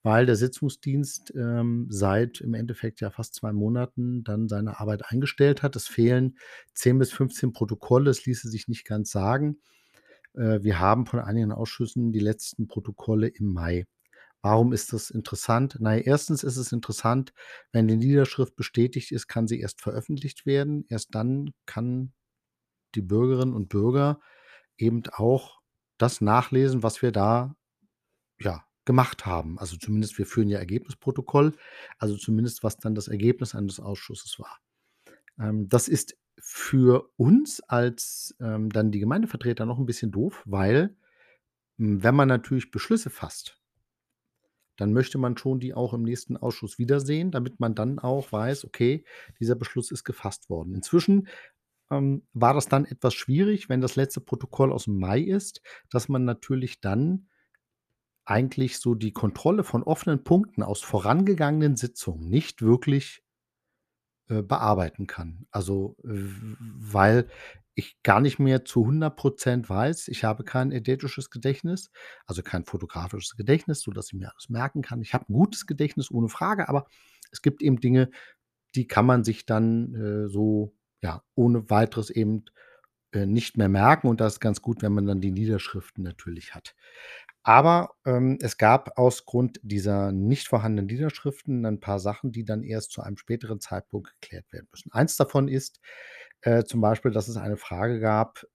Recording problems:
none

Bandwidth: 14.5 kHz